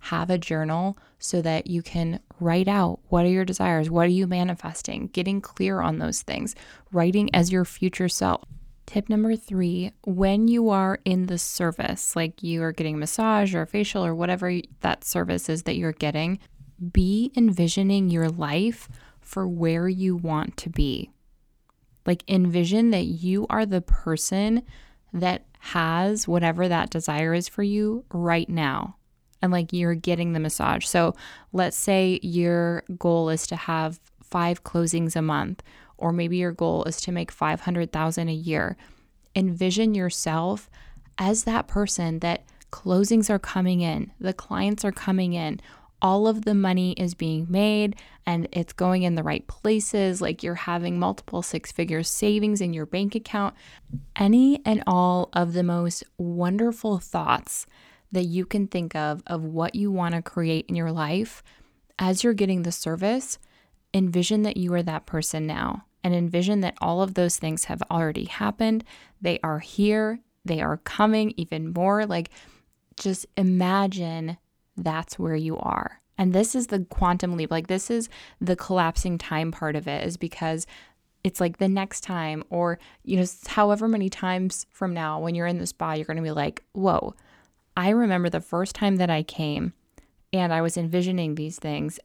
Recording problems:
none

